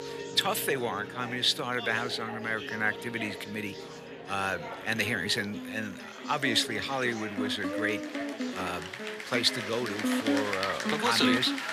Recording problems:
thin; somewhat; fading below 600 Hz
background music; loud; throughout; 7 dB below the speech
chatter from many people; loud; throughout; 9 dB below the speech

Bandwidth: 14.5 kHz